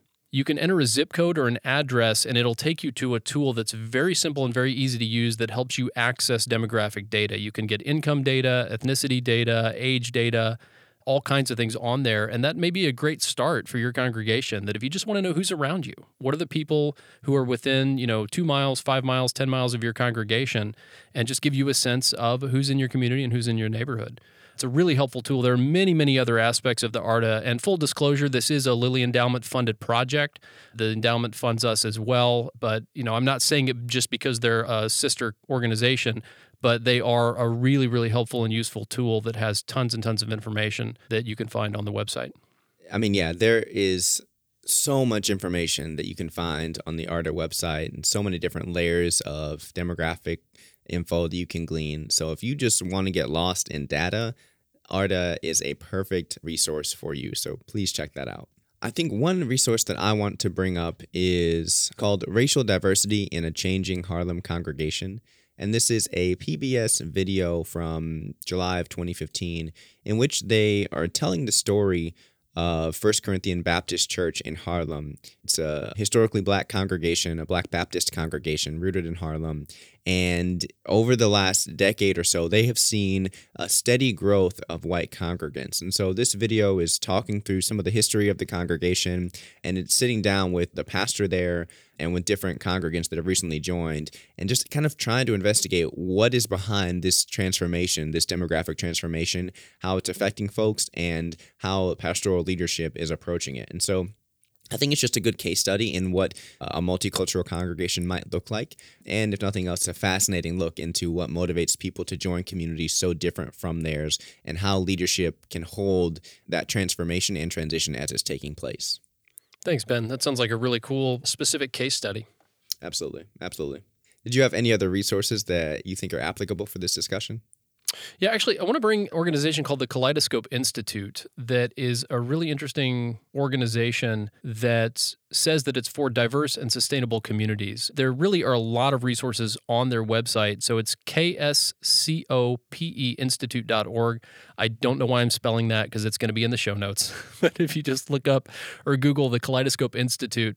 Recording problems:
none

